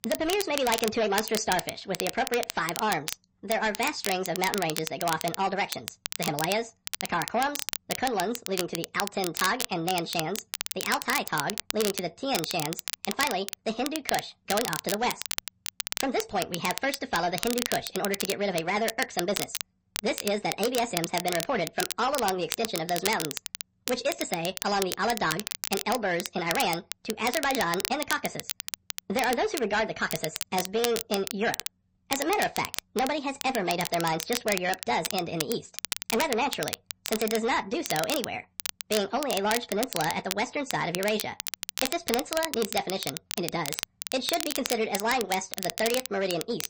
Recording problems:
wrong speed and pitch; too fast and too high; 1.5 times normal speed
distortion; slight; 7% of the sound clipped
garbled, watery; slightly; nothing above 8 kHz
crackle, like an old record; loud; 5 dB below the speech

